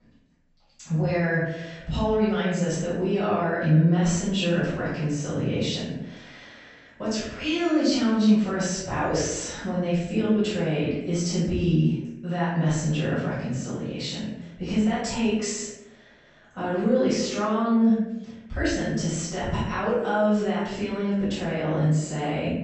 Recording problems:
room echo; strong; dies away in 0.8 s
off-mic speech; far
high frequencies cut off; noticeable; nothing above 8 kHz

